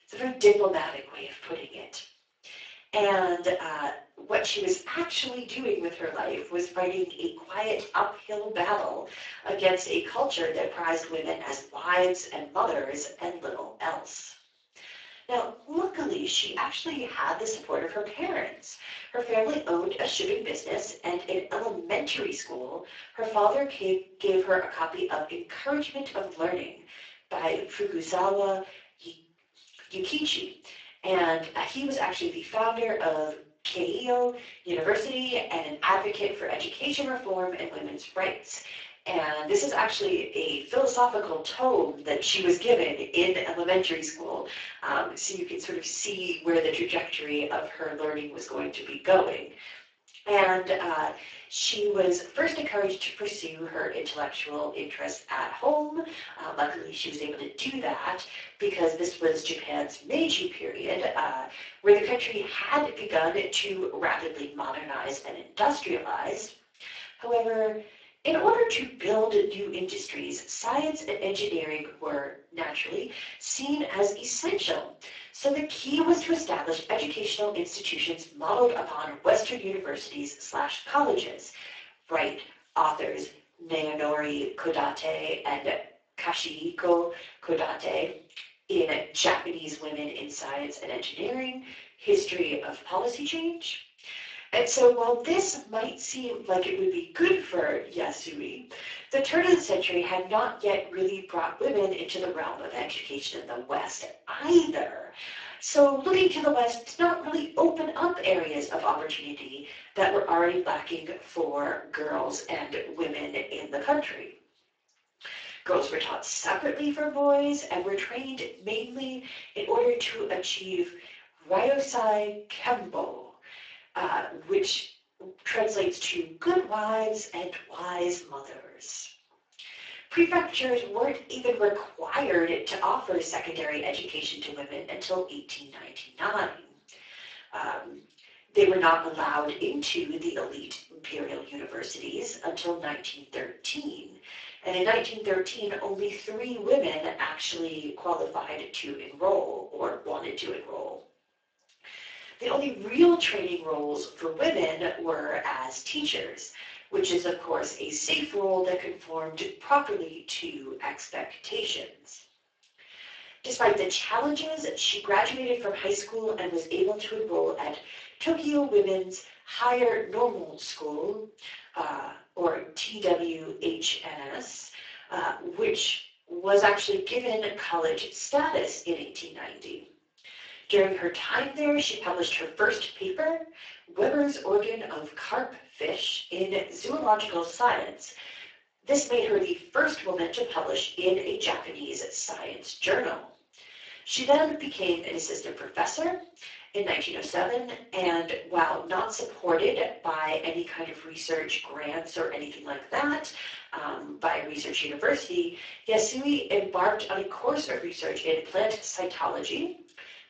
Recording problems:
off-mic speech; far
thin; very; fading below 450 Hz
room echo; slight; dies away in 0.4 s
garbled, watery; slightly; nothing above 7.5 kHz

